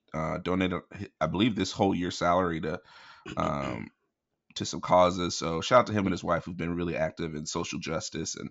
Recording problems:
high frequencies cut off; noticeable; nothing above 8 kHz

